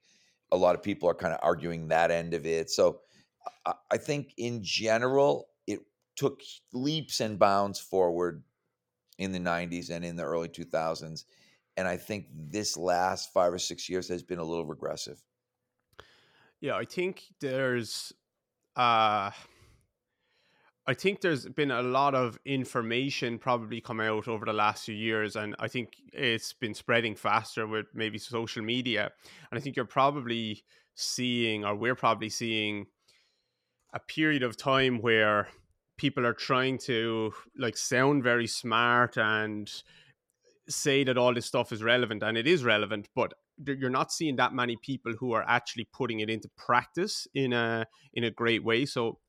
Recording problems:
none

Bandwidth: 17 kHz